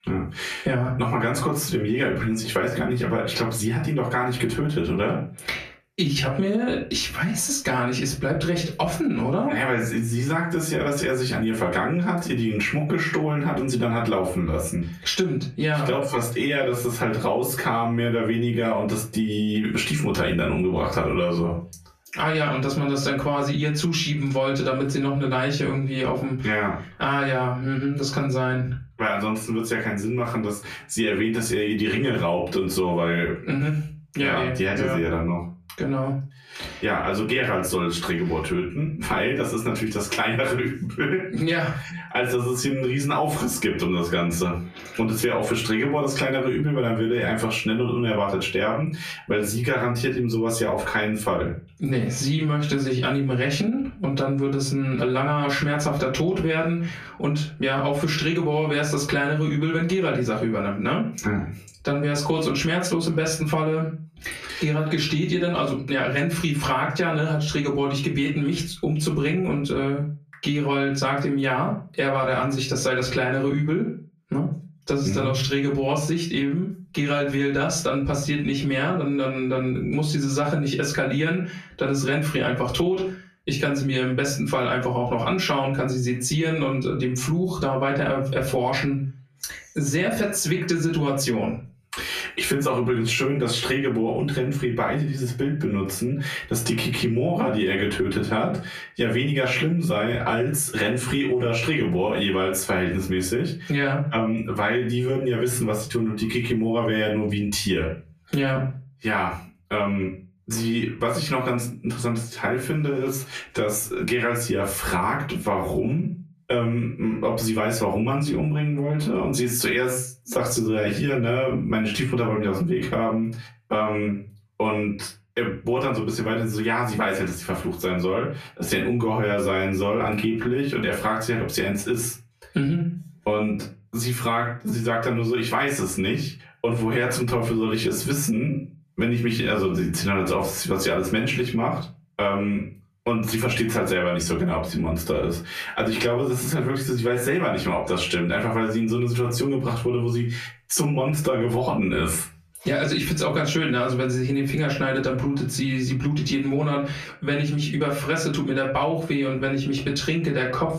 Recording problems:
off-mic speech; far
squashed, flat; heavily
room echo; very slight; dies away in 0.3 s

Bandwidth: 14.5 kHz